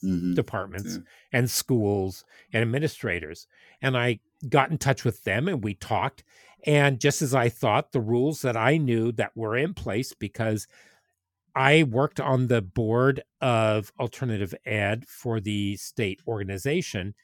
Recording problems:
none

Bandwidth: 18 kHz